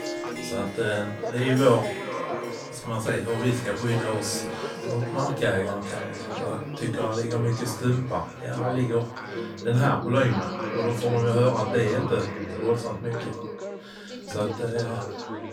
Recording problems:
off-mic speech; far
echo of what is said; noticeable; throughout; 410 ms later, 10 dB below the speech
room echo; slight; dies away in 0.3 s
background chatter; loud; throughout; 3 voices, 9 dB below the speech
background music; noticeable; throughout; 15 dB below the speech

